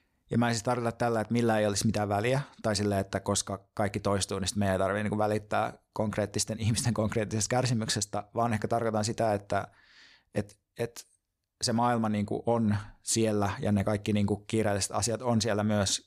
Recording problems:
none

